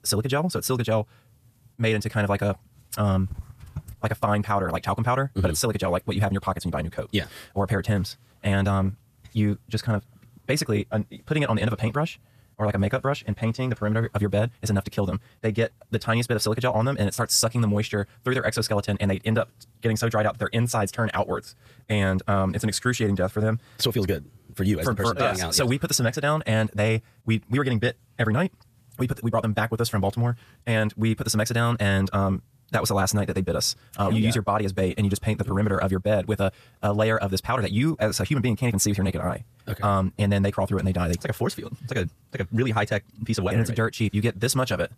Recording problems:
wrong speed, natural pitch; too fast; 1.7 times normal speed

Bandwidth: 14.5 kHz